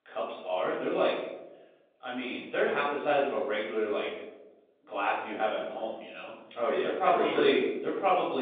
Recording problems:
off-mic speech; far
room echo; noticeable; dies away in 0.8 s
phone-call audio; nothing above 3.5 kHz
abrupt cut into speech; at the end

